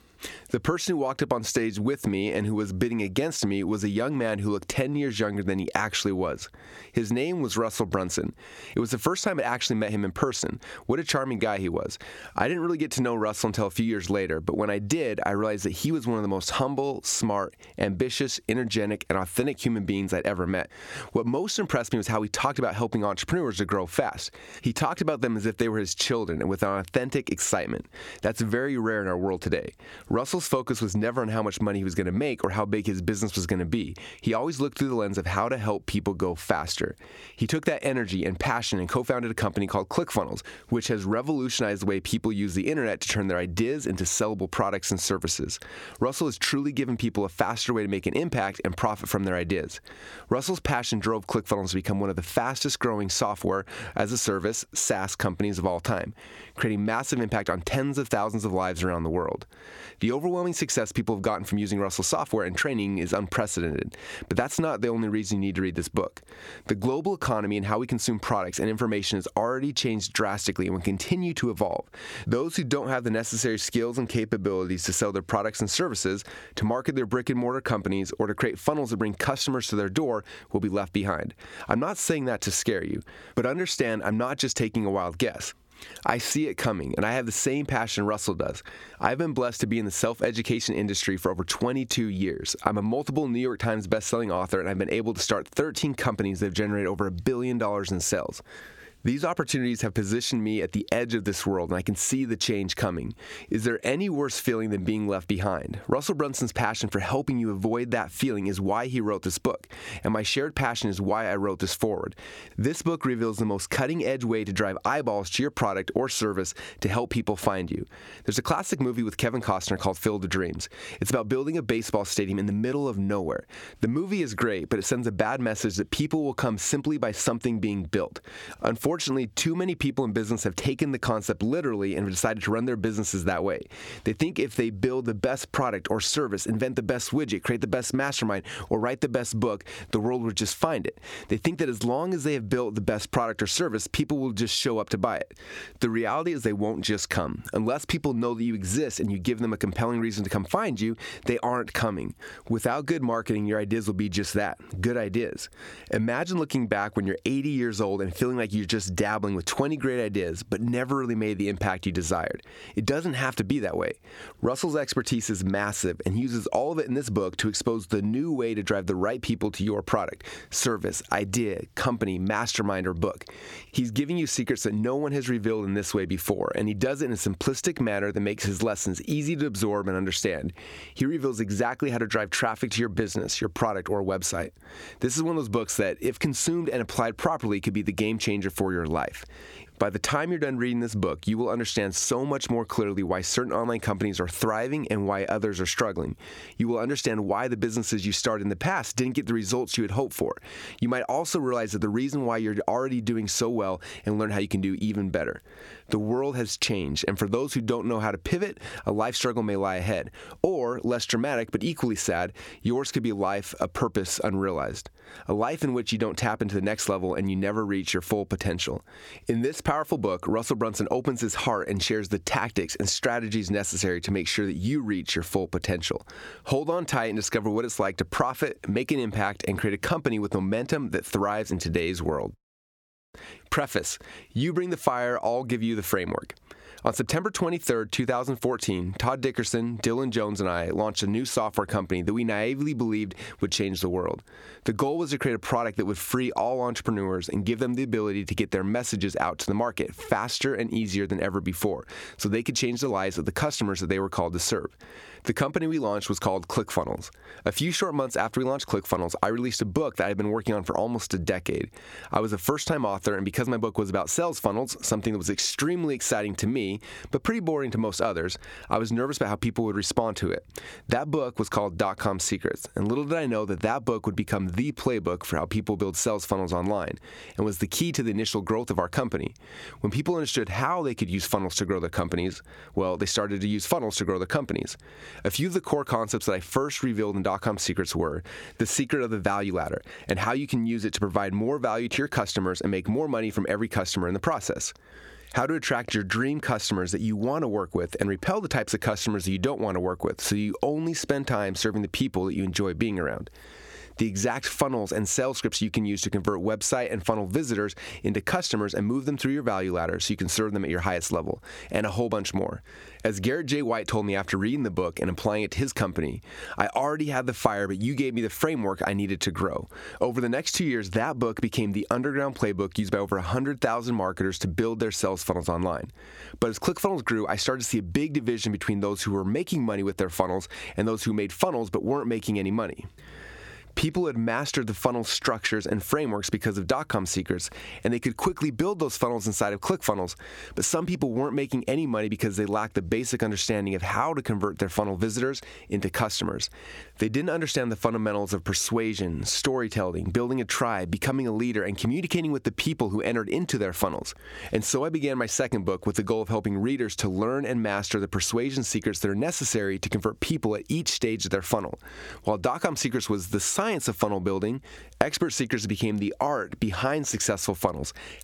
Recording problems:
squashed, flat; somewhat

